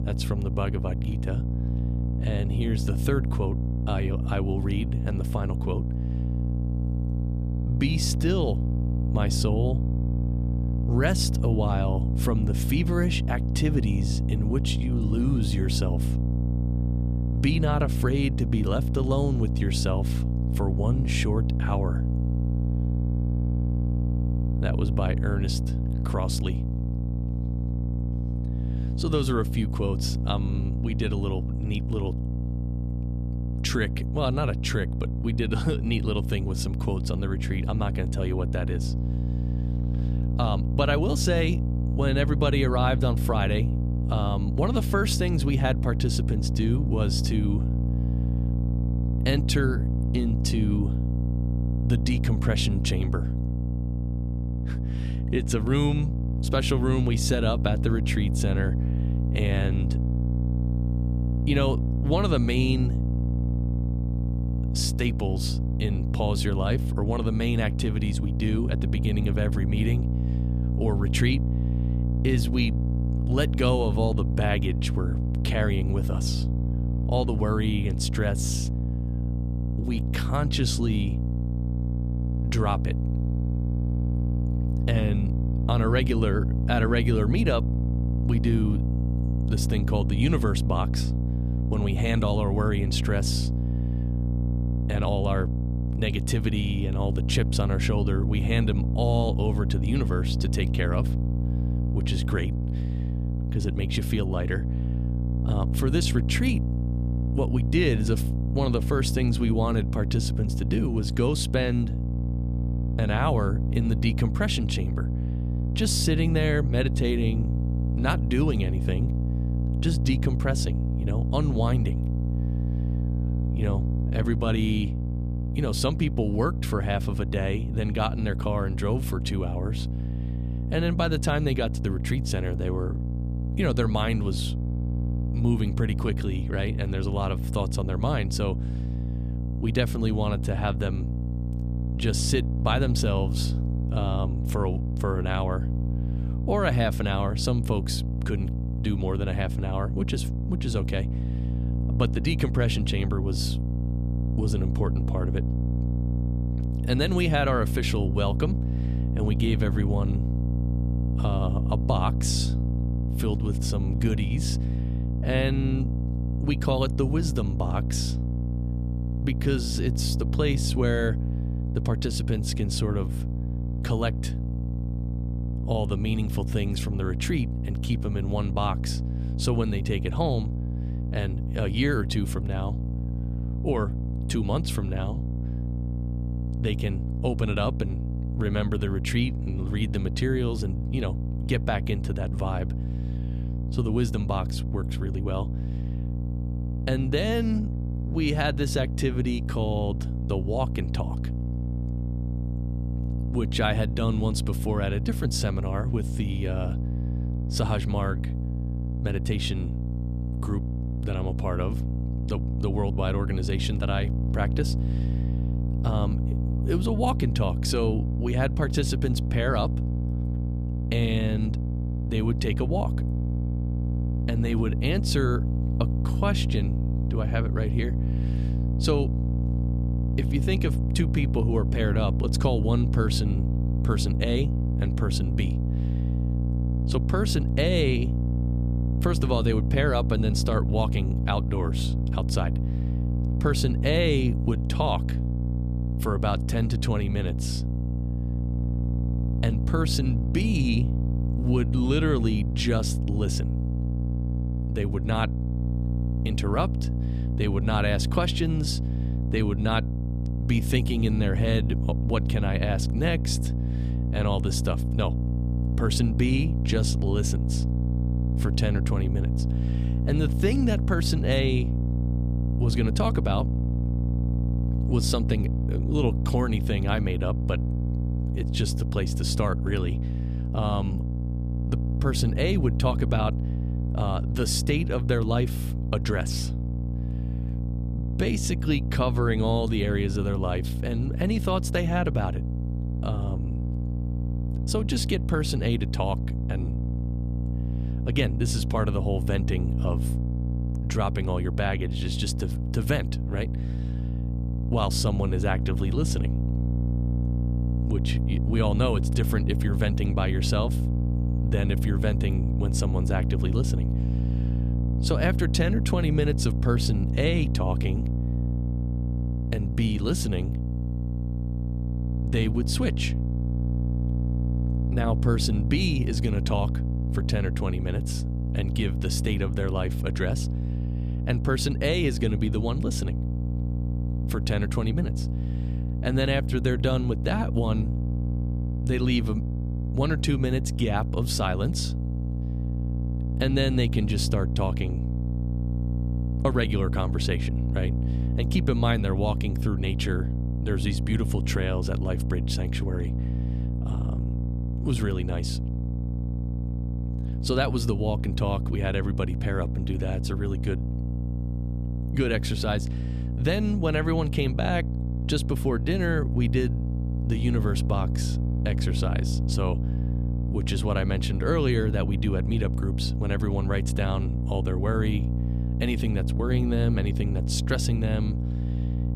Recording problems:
electrical hum; loud; throughout; 60 Hz, 8 dB below the speech

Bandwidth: 14.5 kHz